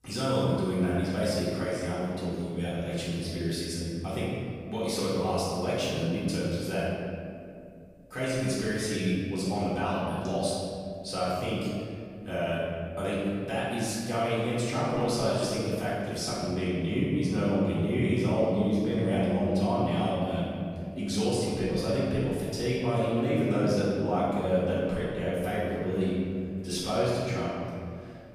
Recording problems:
room echo; strong; dies away in 2 s
off-mic speech; far

